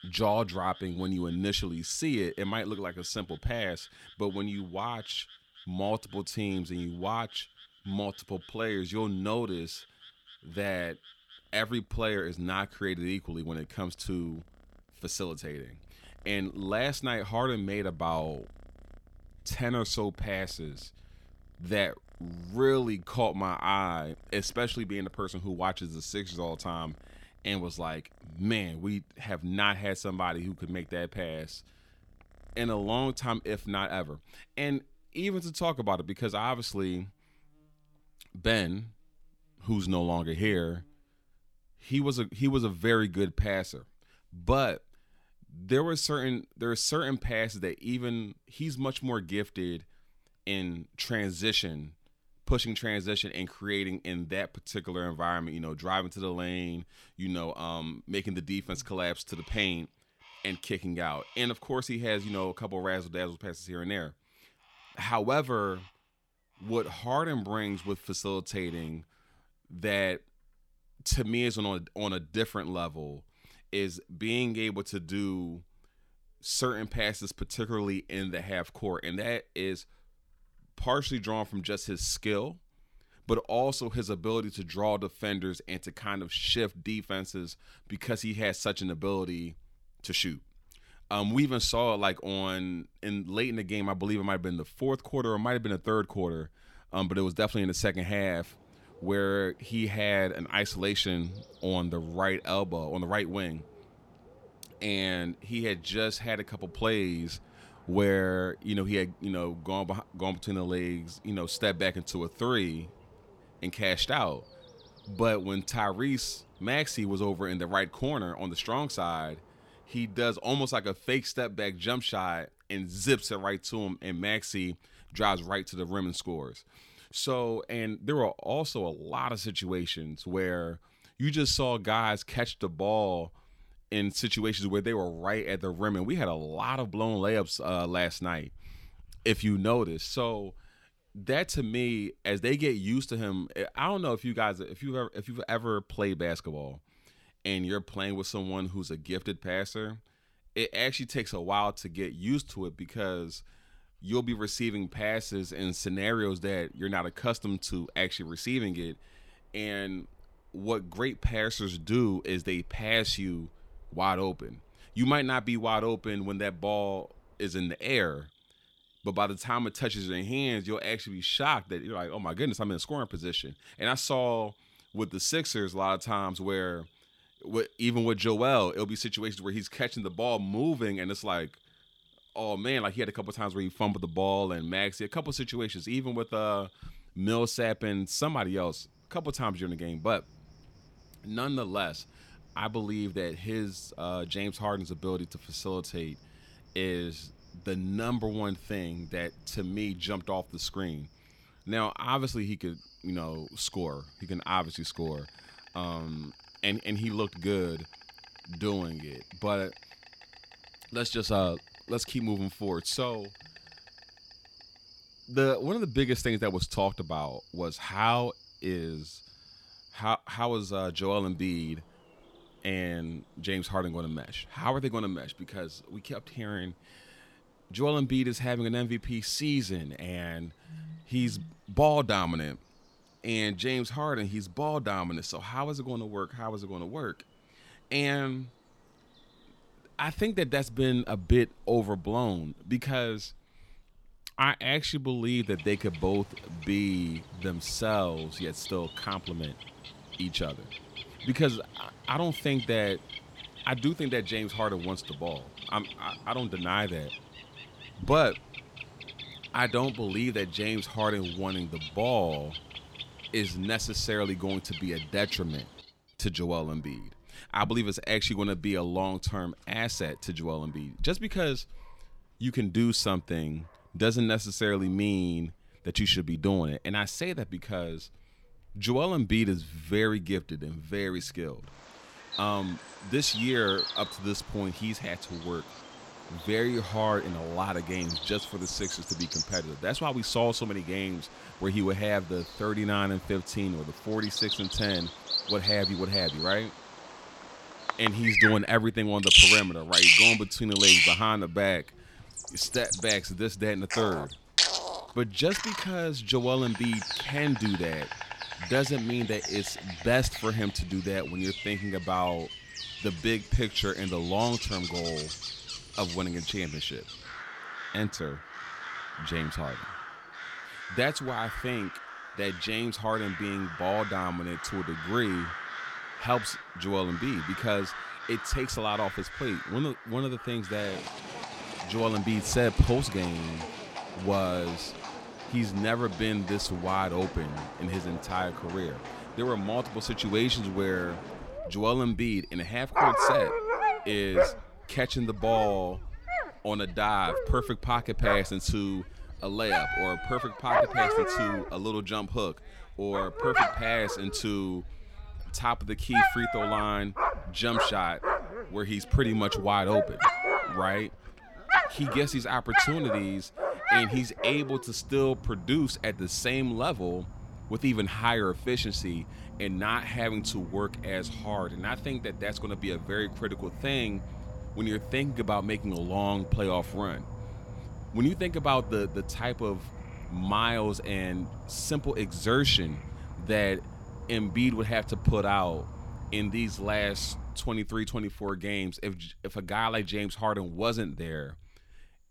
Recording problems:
animal sounds; loud; throughout; as loud as the speech

